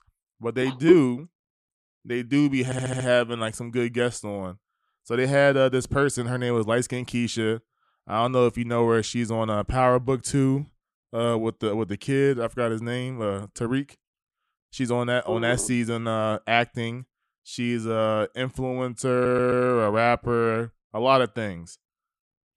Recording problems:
audio stuttering; at 2.5 s and at 19 s

